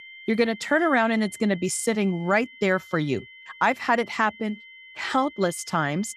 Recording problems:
high-pitched whine; noticeable; throughout; 2 kHz, 20 dB below the speech

